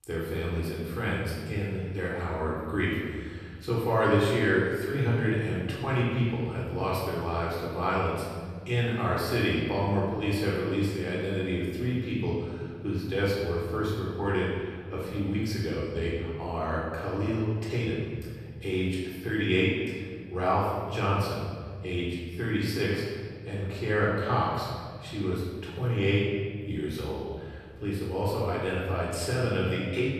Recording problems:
room echo; strong; dies away in 1.9 s
off-mic speech; far

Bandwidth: 14.5 kHz